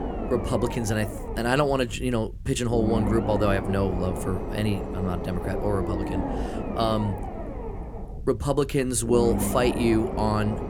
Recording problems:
low rumble; loud; throughout; 6 dB below the speech

